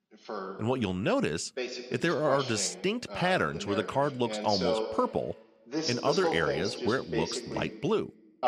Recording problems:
voice in the background; loud; throughout; 5 dB below the speech

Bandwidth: 15 kHz